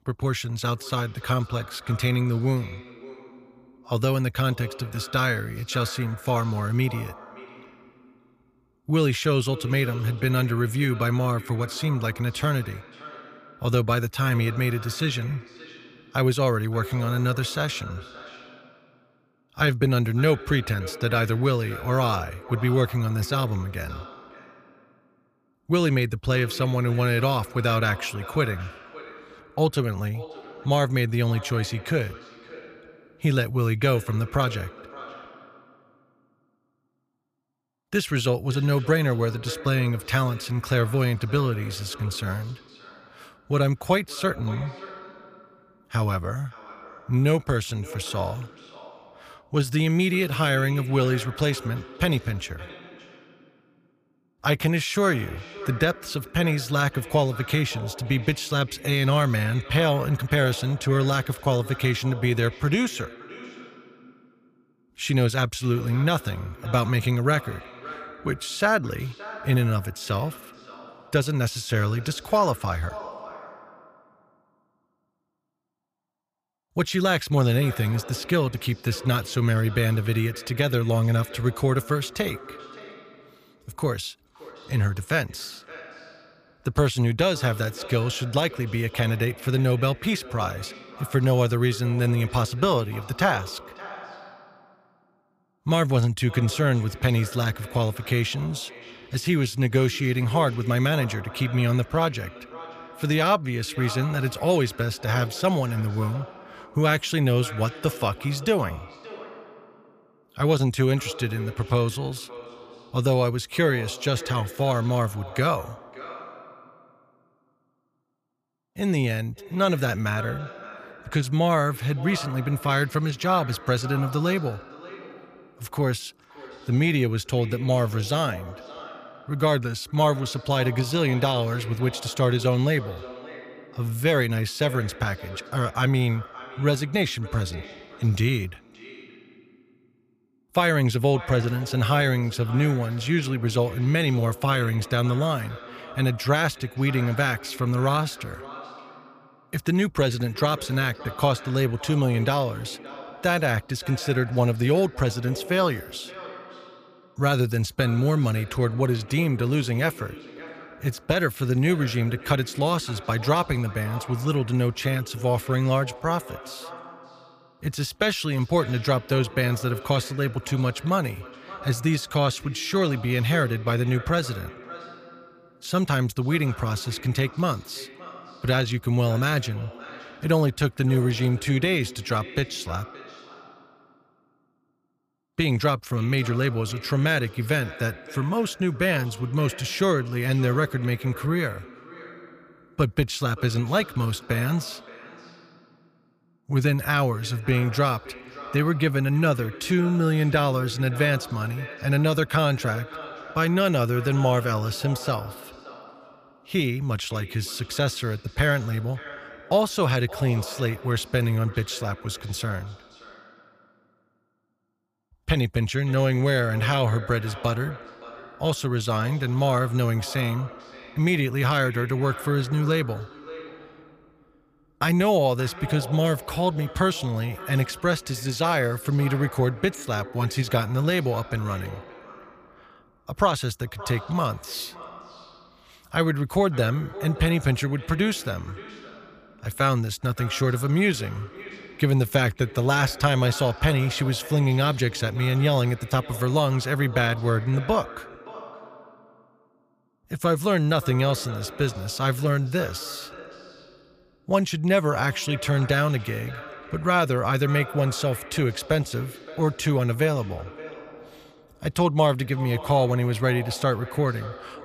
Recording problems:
echo of what is said; noticeable; throughout; 570 ms later, 15 dB below the speech

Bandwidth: 15 kHz